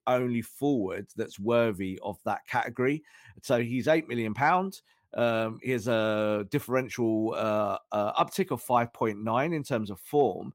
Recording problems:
none

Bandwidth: 16 kHz